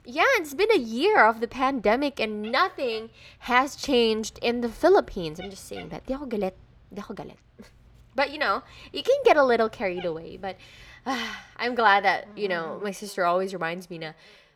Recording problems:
animal sounds; faint; throughout; 25 dB below the speech

